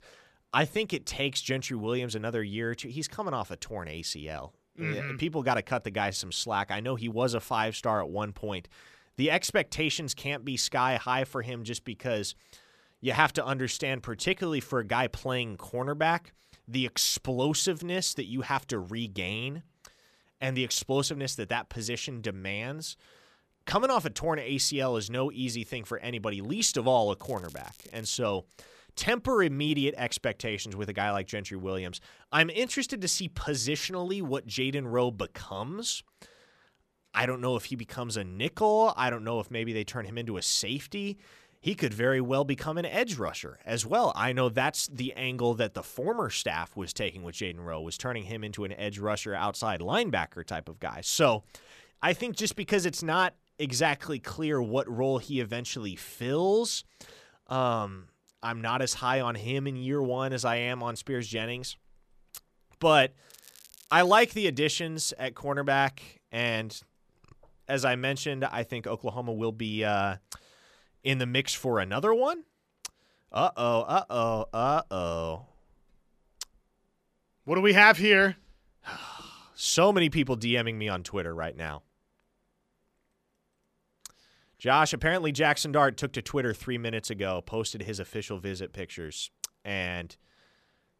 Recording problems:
crackling; faint; from 27 to 28 s and at 1:03; 25 dB below the speech

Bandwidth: 14.5 kHz